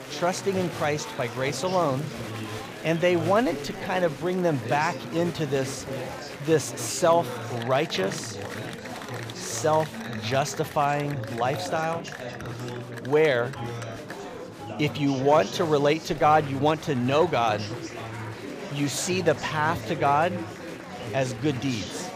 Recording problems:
chatter from many people; loud; throughout; 10 dB below the speech

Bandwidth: 15 kHz